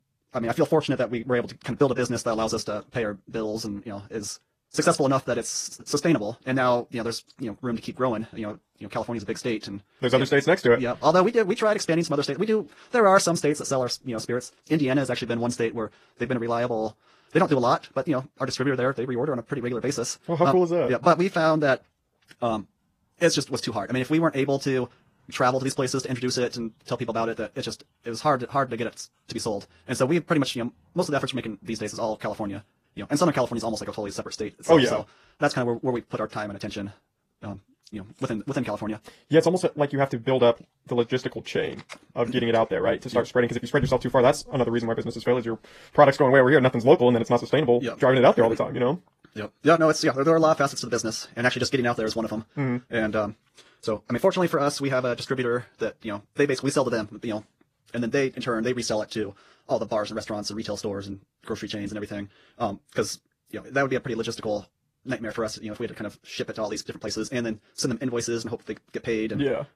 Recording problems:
wrong speed, natural pitch; too fast; 1.6 times normal speed
garbled, watery; slightly

